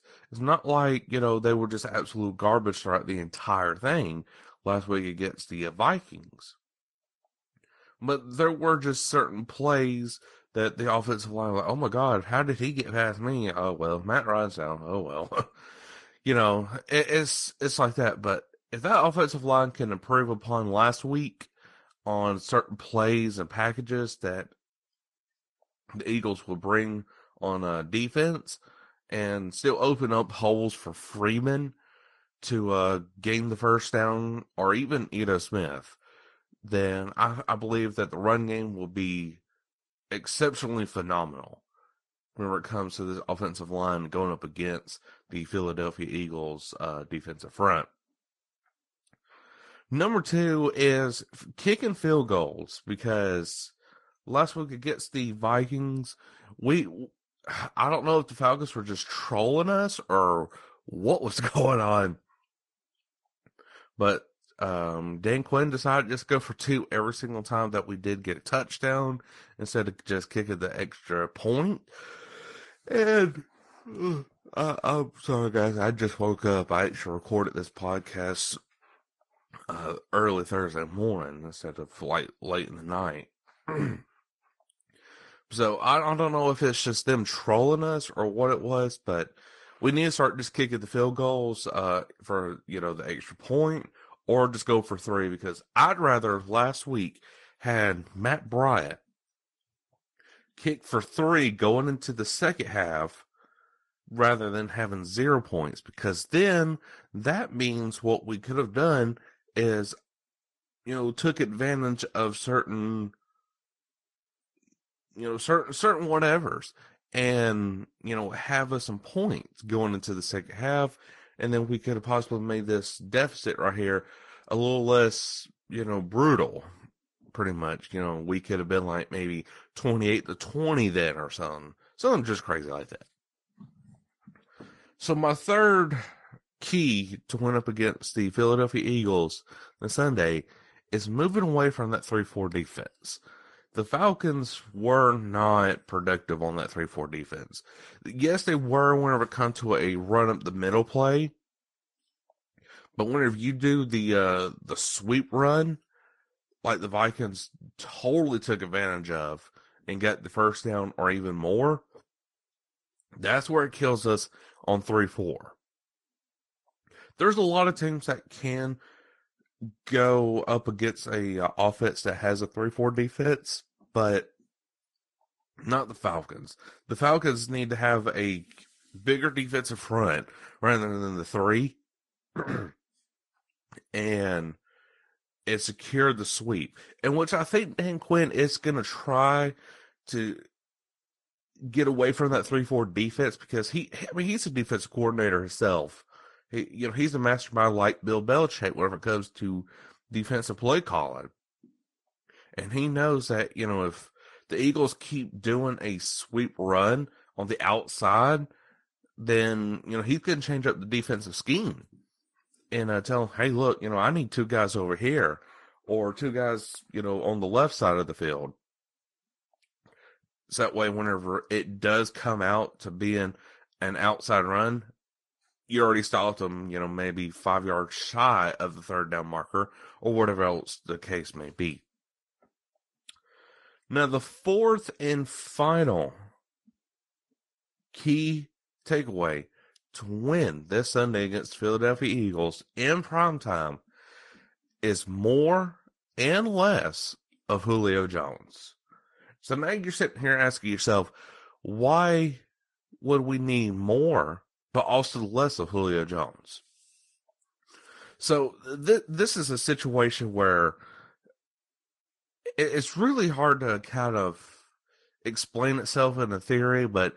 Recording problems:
garbled, watery; slightly; nothing above 10.5 kHz

